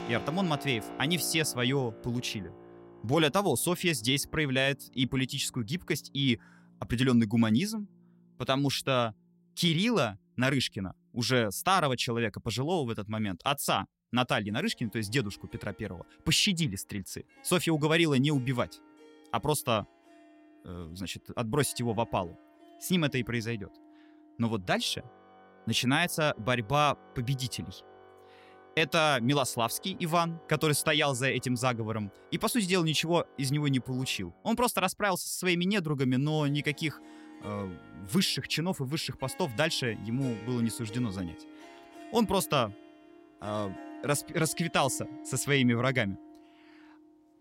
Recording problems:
background music; faint; throughout; 20 dB below the speech

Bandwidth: 16 kHz